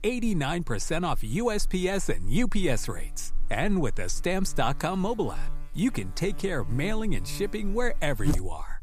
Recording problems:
electrical hum; noticeable; throughout; 60 Hz, 15 dB below the speech

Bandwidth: 15 kHz